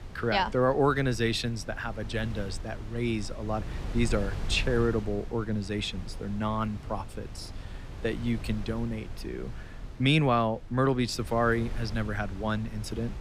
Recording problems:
wind noise on the microphone; occasional gusts; 20 dB below the speech

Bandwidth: 15.5 kHz